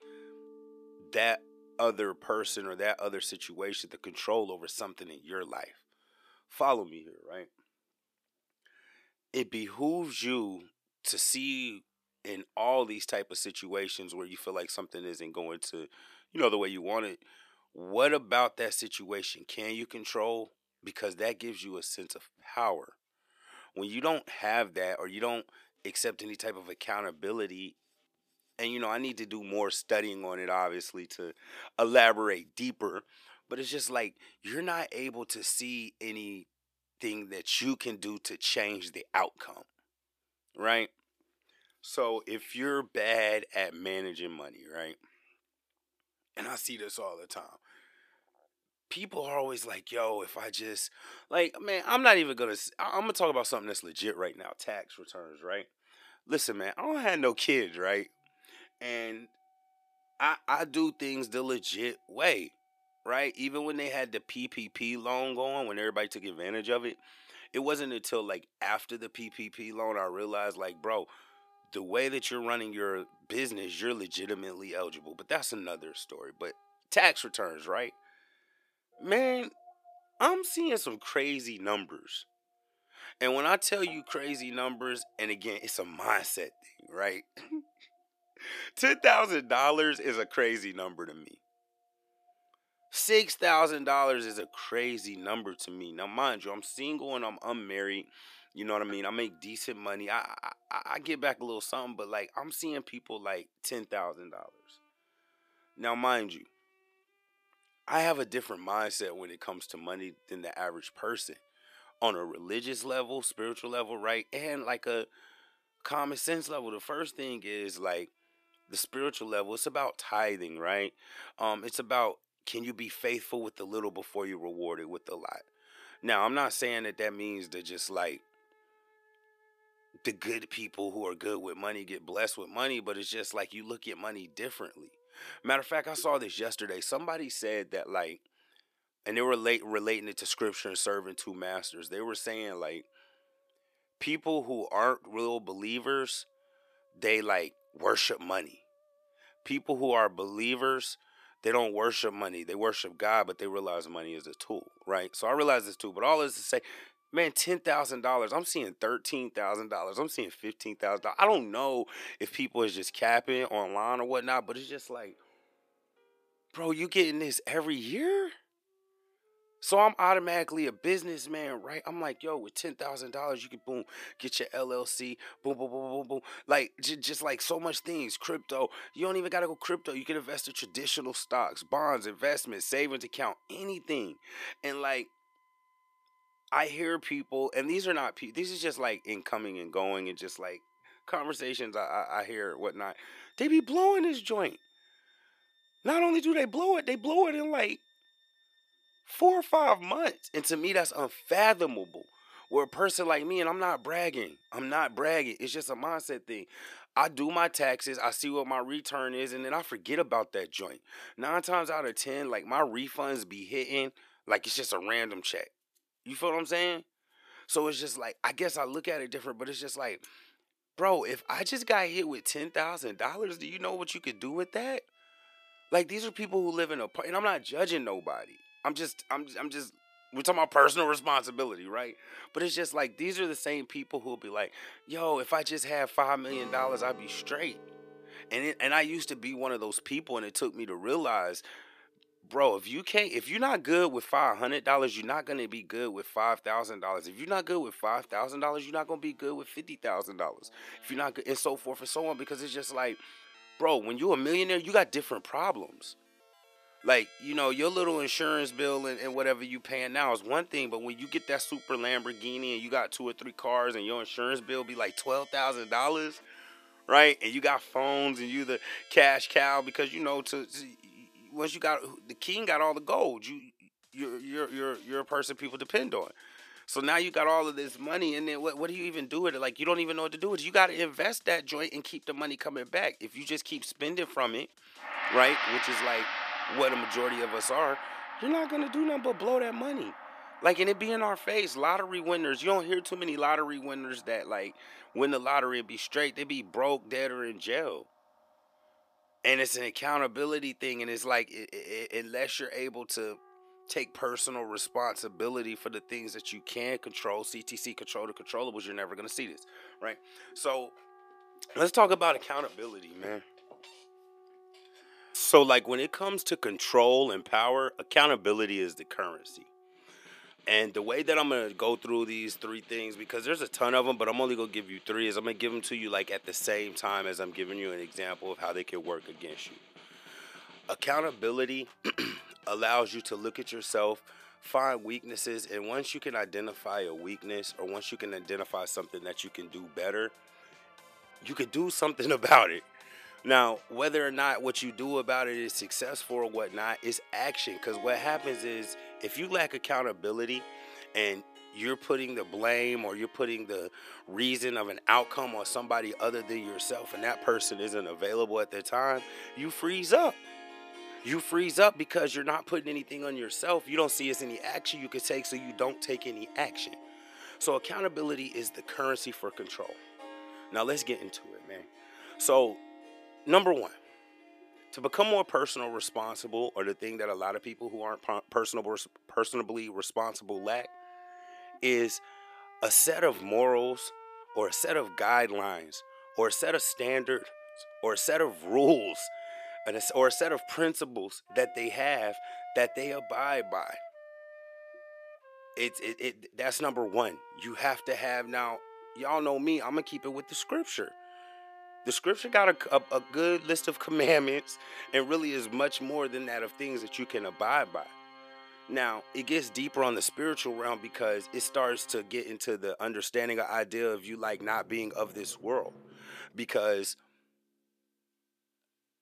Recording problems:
thin; somewhat; fading below 400 Hz
background music; noticeable; throughout; 15 dB below the speech

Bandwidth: 14.5 kHz